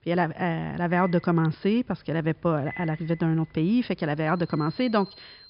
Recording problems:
high frequencies cut off; noticeable; nothing above 5.5 kHz
alarms or sirens; noticeable; throughout; 20 dB below the speech

